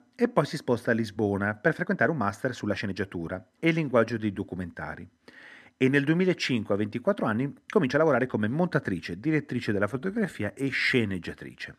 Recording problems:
uneven, jittery; strongly; from 1 to 11 s

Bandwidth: 13.5 kHz